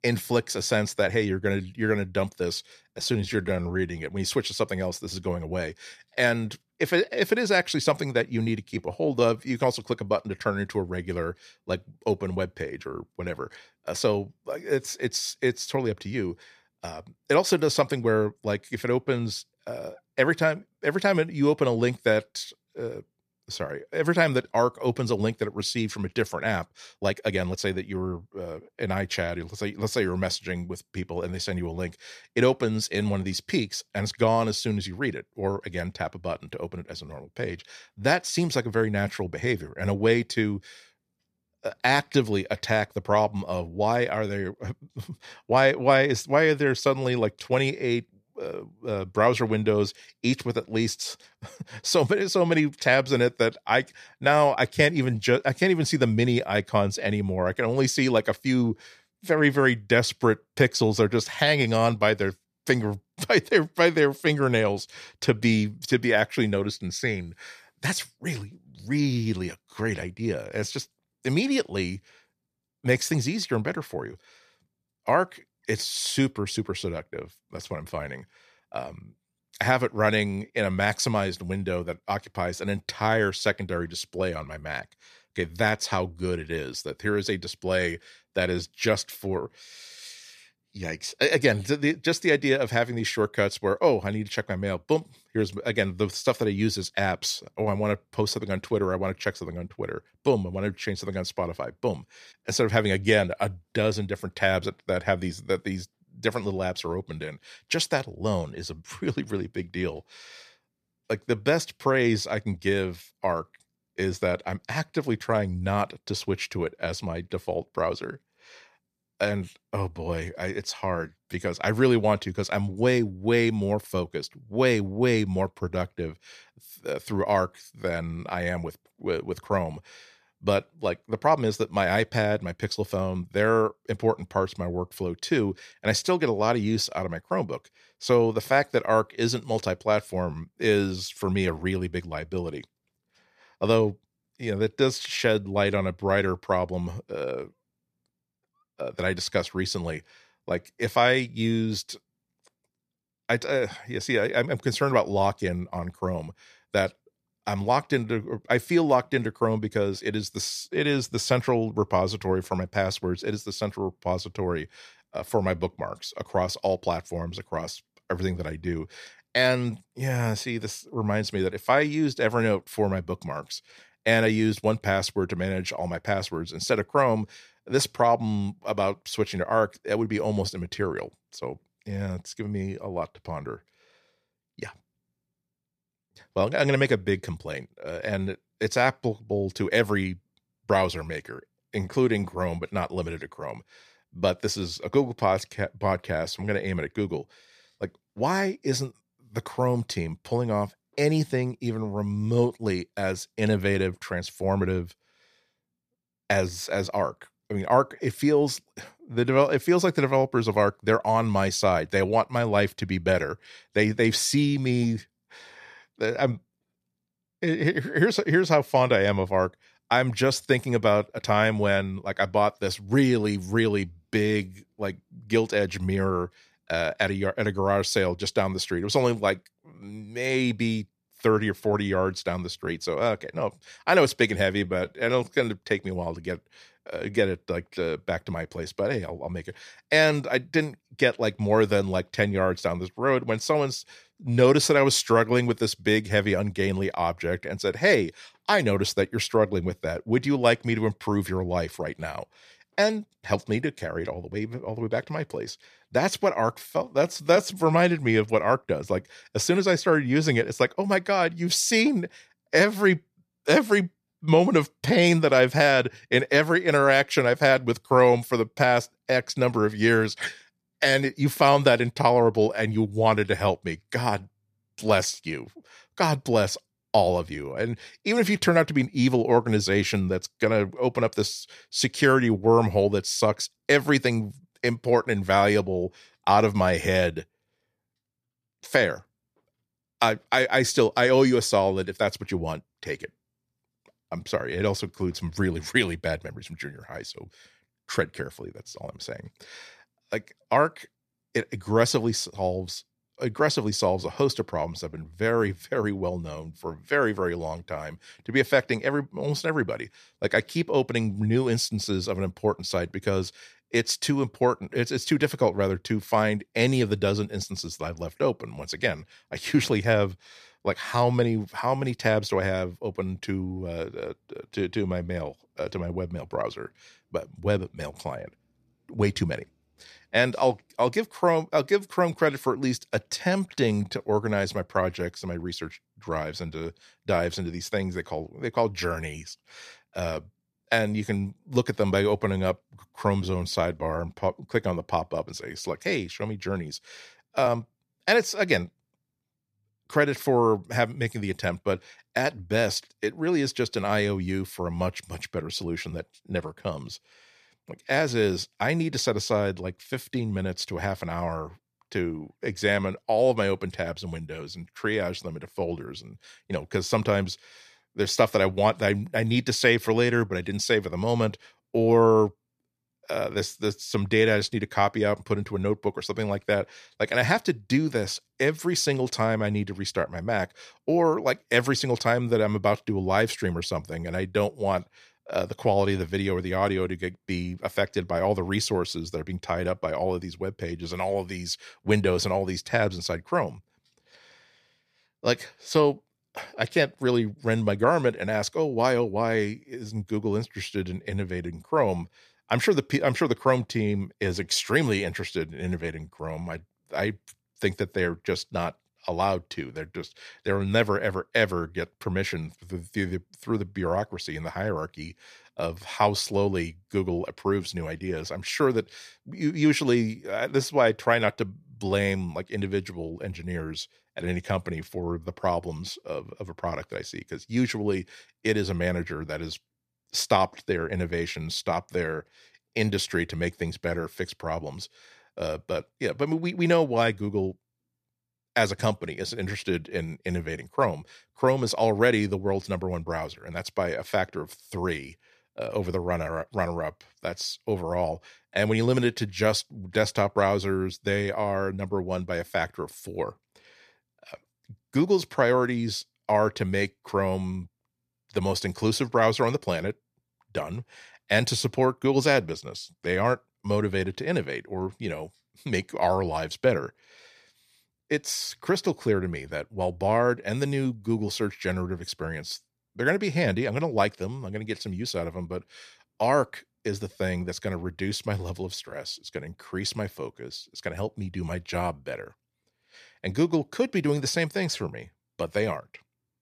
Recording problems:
uneven, jittery; strongly; from 3 s to 5:48

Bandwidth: 14.5 kHz